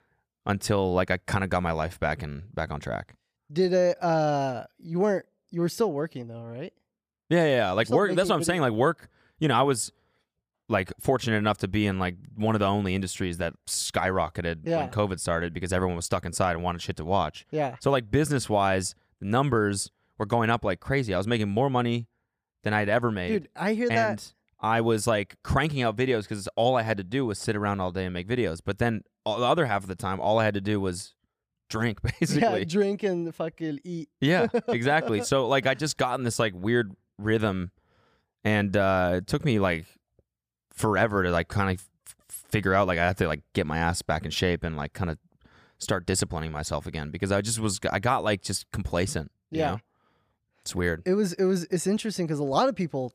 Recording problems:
none

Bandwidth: 15 kHz